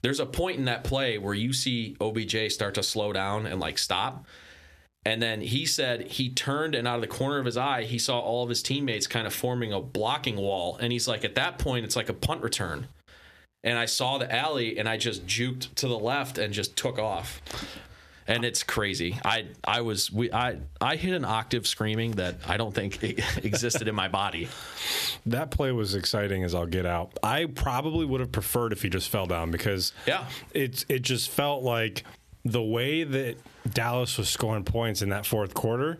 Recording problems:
squashed, flat; heavily

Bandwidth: 14 kHz